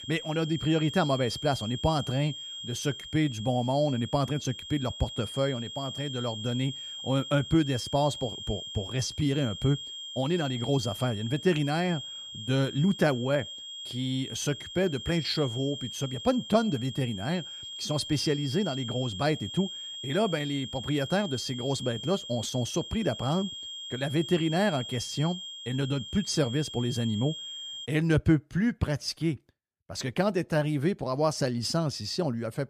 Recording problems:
high-pitched whine; loud; until 28 s; 3 kHz, 9 dB below the speech

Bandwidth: 15 kHz